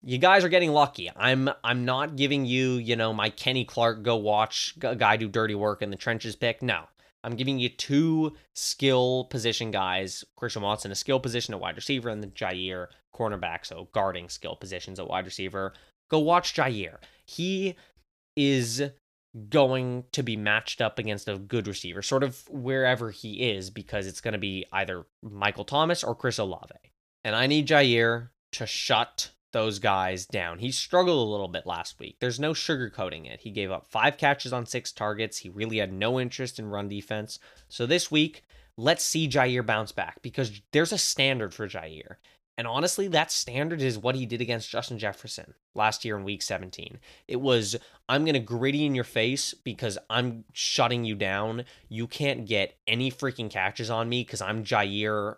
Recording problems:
none

